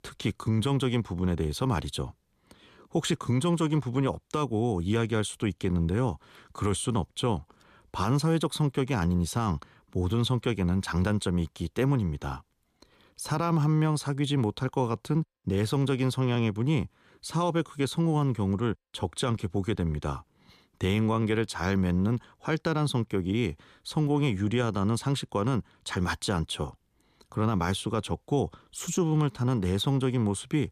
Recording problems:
none

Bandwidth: 14.5 kHz